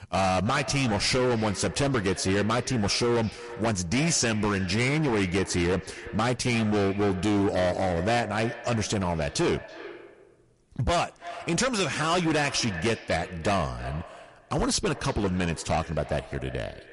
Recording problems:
distortion; heavy; 18% of the sound clipped
echo of what is said; noticeable; throughout; 330 ms later, 15 dB below the speech
garbled, watery; slightly; nothing above 11 kHz

